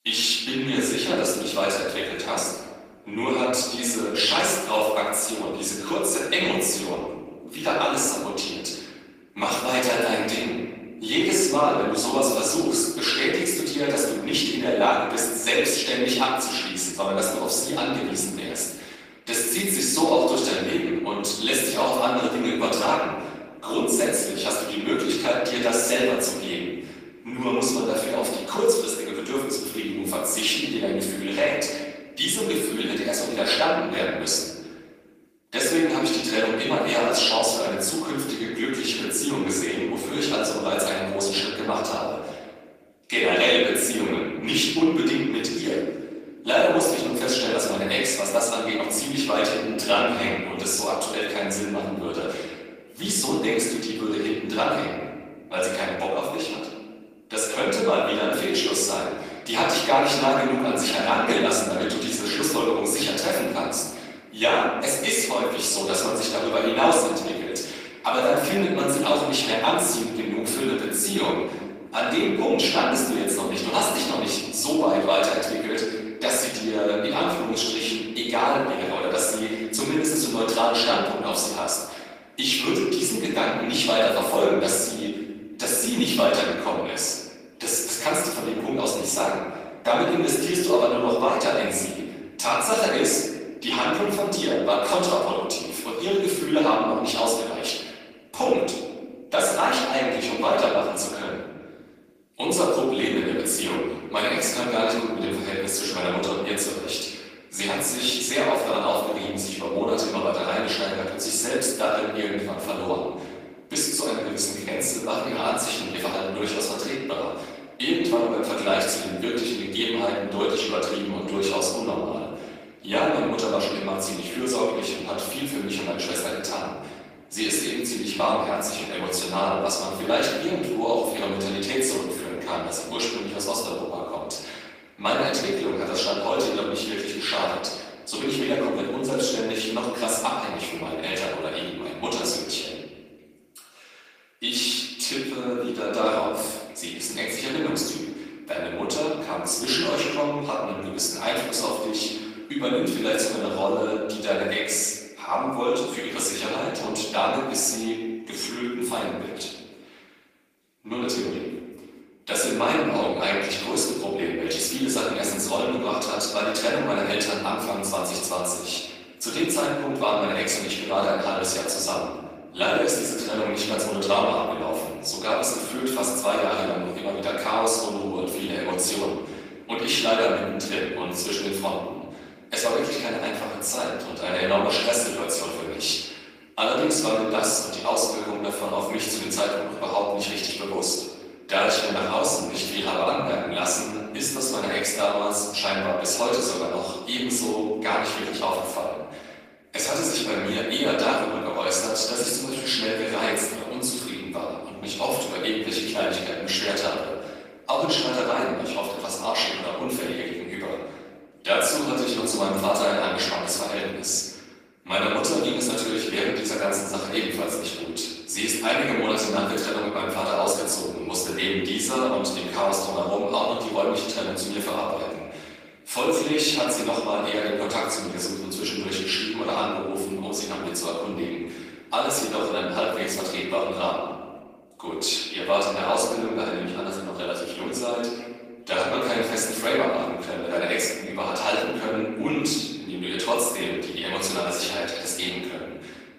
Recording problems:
off-mic speech; far
room echo; noticeable; dies away in 1.4 s
thin; somewhat; fading below 400 Hz
garbled, watery; slightly; nothing above 15 kHz

